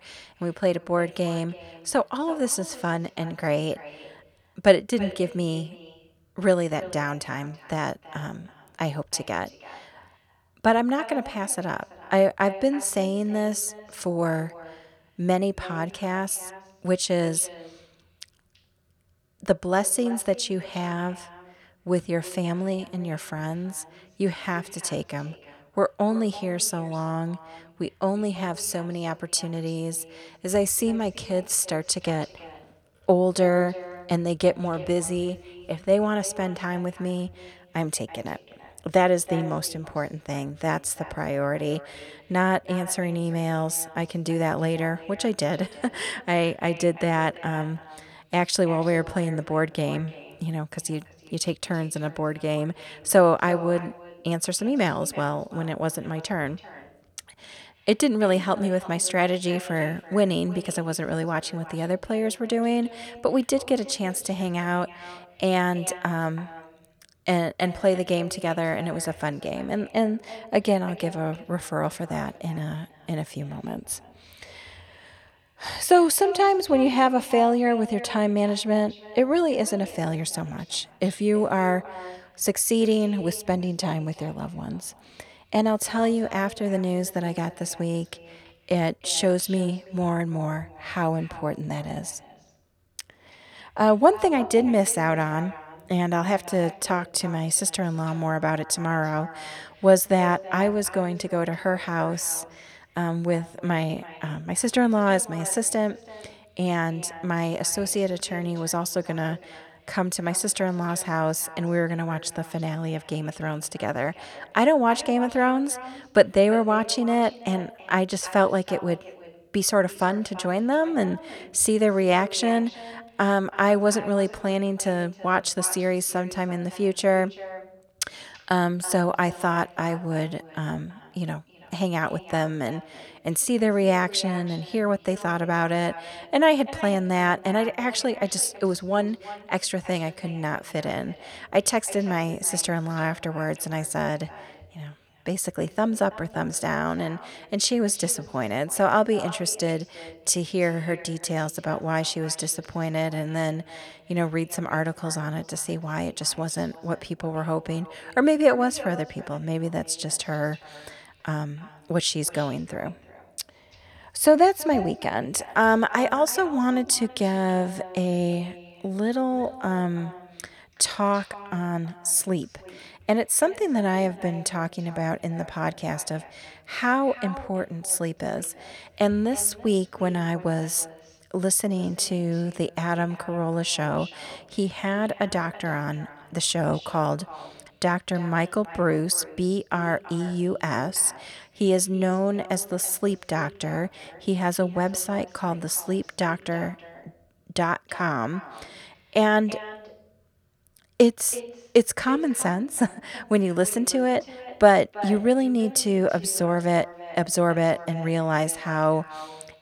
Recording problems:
echo of what is said; noticeable; throughout; 330 ms later, 20 dB below the speech

